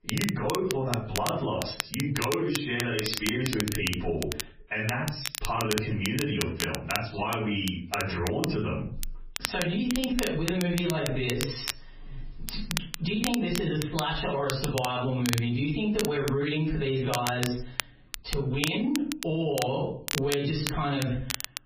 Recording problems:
off-mic speech; far
garbled, watery; badly; nothing above 5.5 kHz
squashed, flat; heavily
room echo; slight; dies away in 0.4 s
crackle, like an old record; loud; 6 dB below the speech

